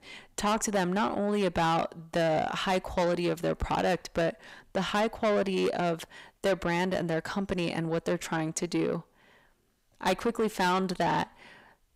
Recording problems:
distortion; heavy; 7 dB below the speech

